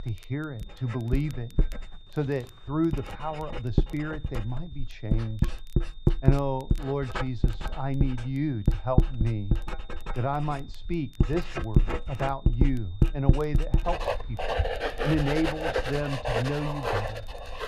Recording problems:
muffled; slightly; fading above 2 kHz
household noises; very loud; throughout; 1 dB above the speech
high-pitched whine; faint; throughout; 3.5 kHz, 25 dB below the speech
crackle, like an old record; faint; 30 dB below the speech

